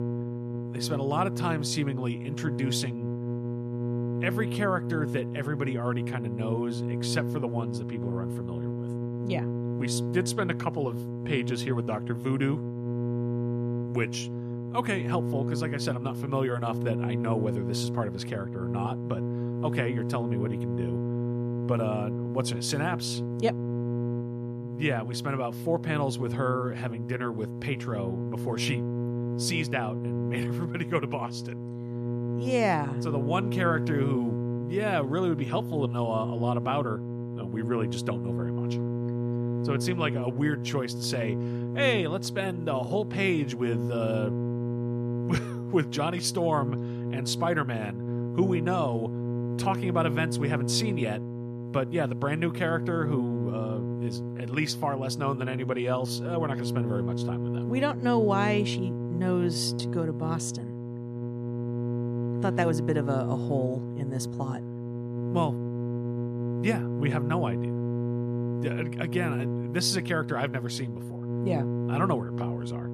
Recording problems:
electrical hum; loud; throughout; 60 Hz, 7 dB below the speech

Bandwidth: 14.5 kHz